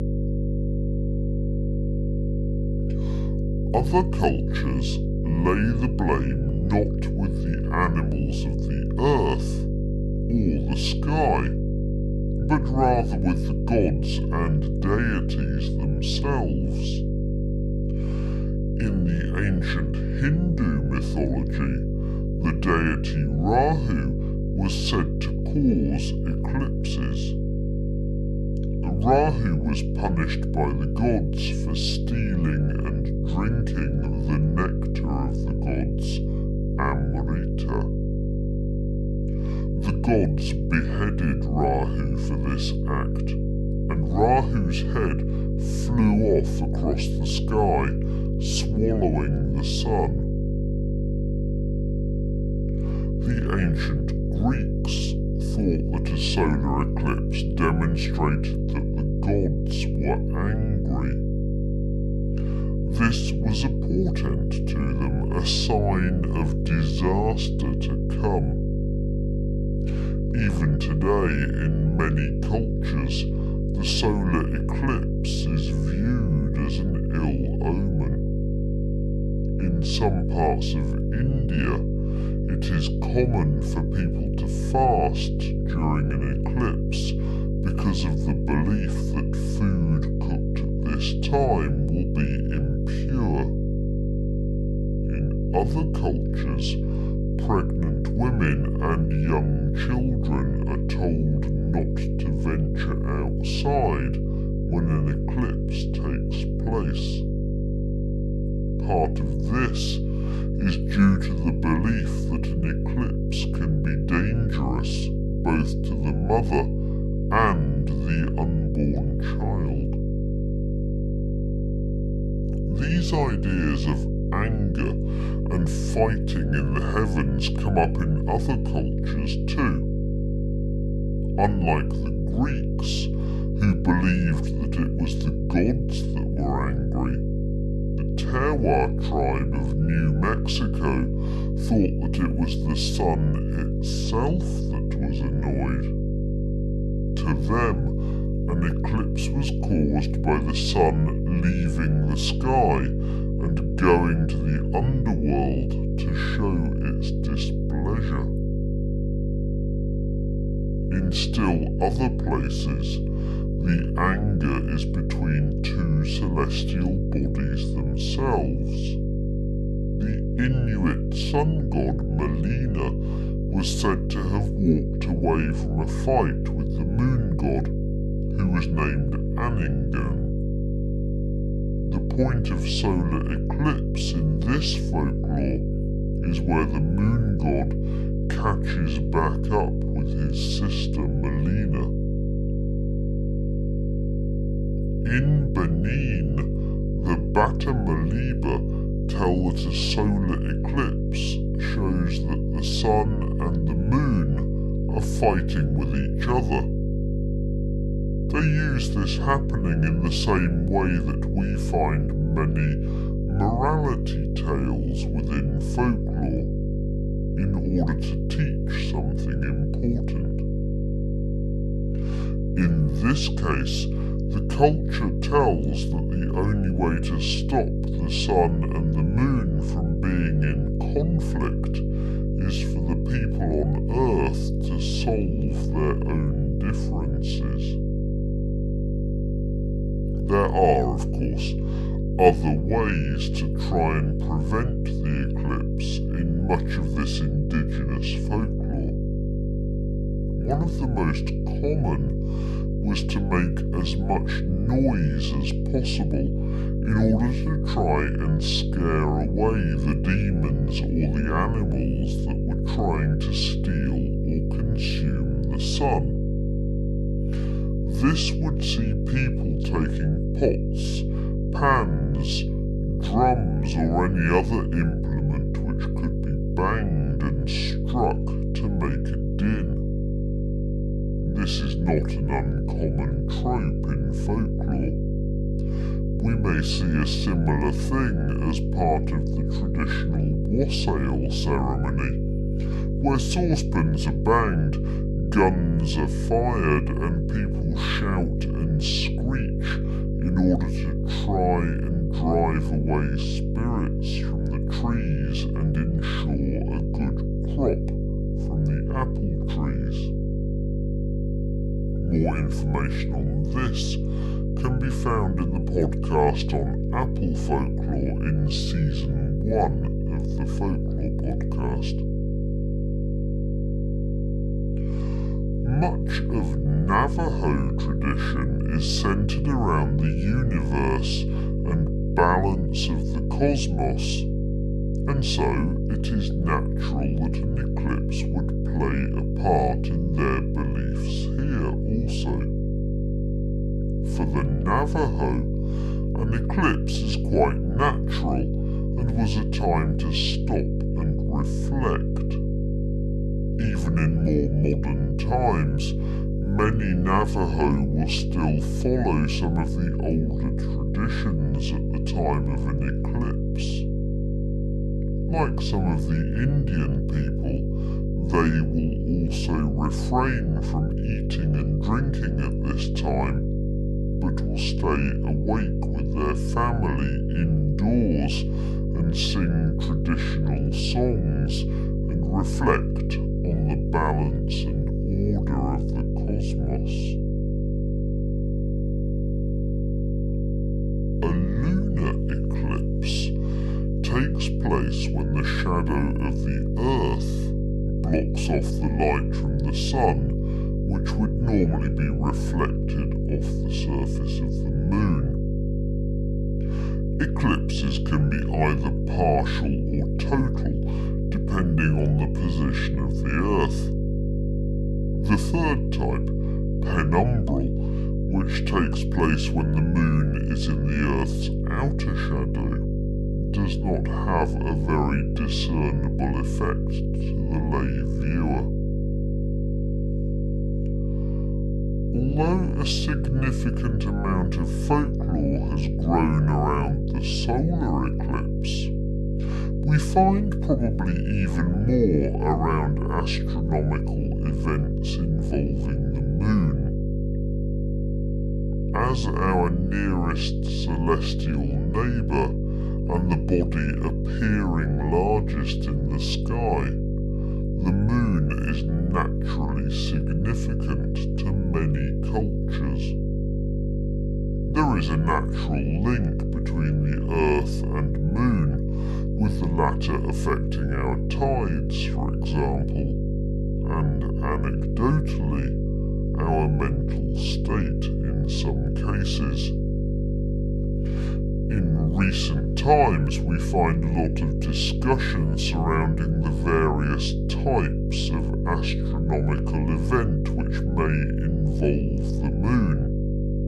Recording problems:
wrong speed and pitch; too slow and too low; 0.7 times normal speed
electrical hum; loud; throughout; 50 Hz, 6 dB below the speech

